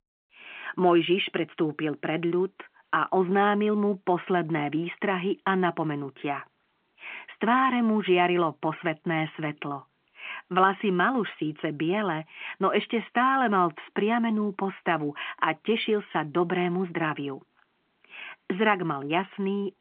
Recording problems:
phone-call audio; nothing above 3.5 kHz

